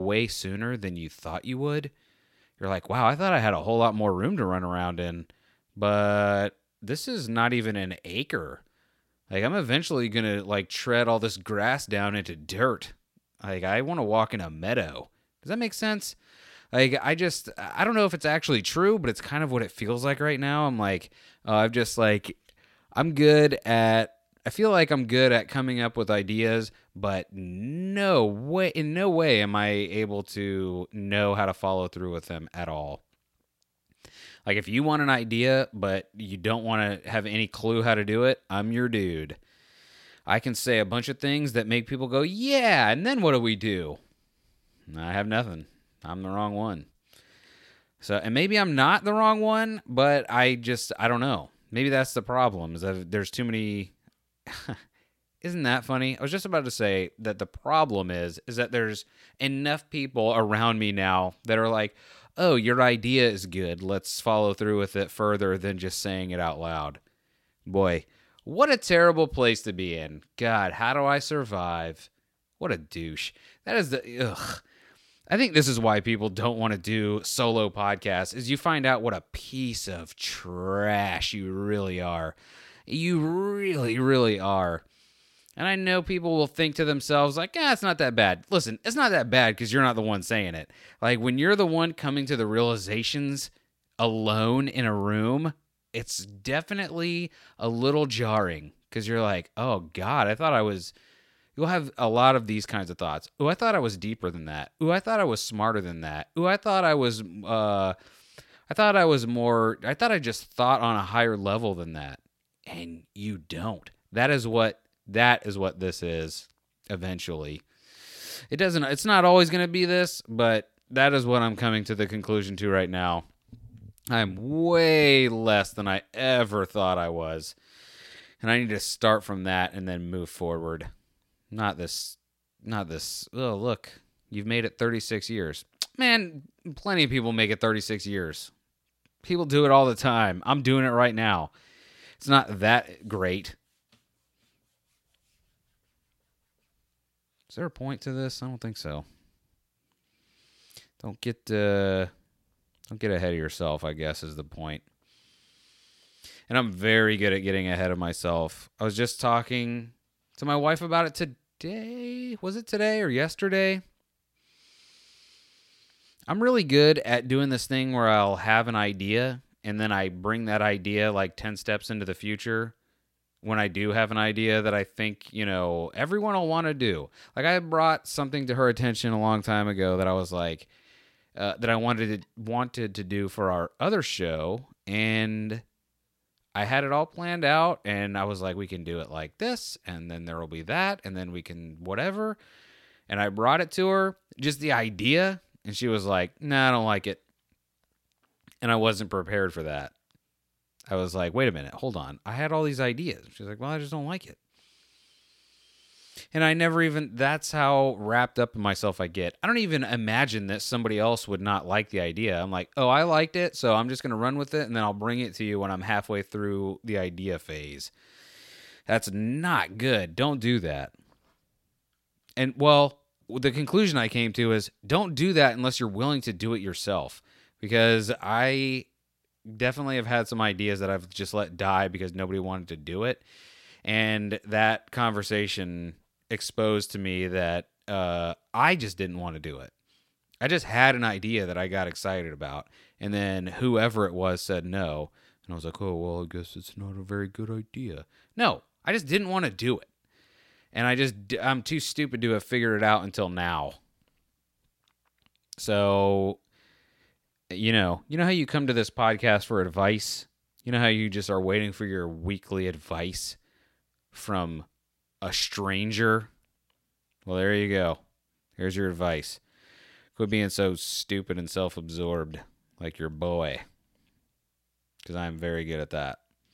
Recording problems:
abrupt cut into speech; at the start

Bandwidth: 16.5 kHz